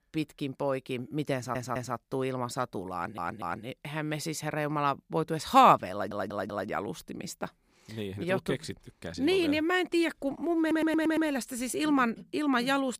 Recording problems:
audio stuttering; 4 times, first at 1.5 s

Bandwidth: 15 kHz